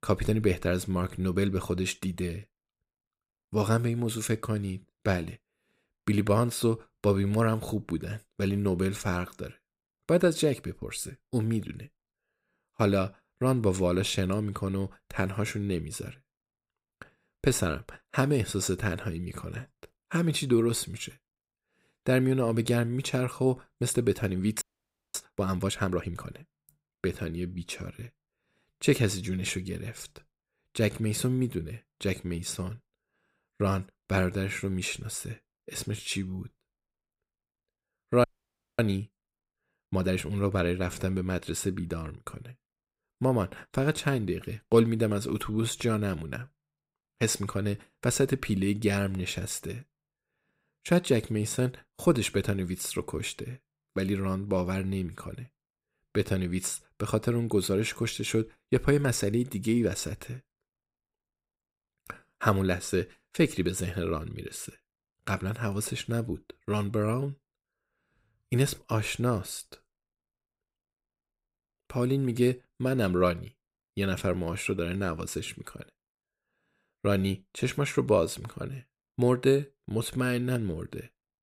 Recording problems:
audio freezing; at 25 s for 0.5 s and at 38 s for 0.5 s

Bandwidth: 15.5 kHz